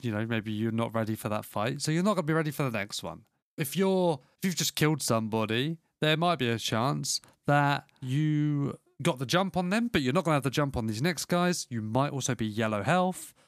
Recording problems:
none

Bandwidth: 14.5 kHz